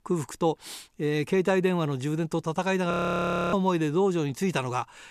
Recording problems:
audio freezing; at 3 s for 0.5 s

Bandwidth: 14.5 kHz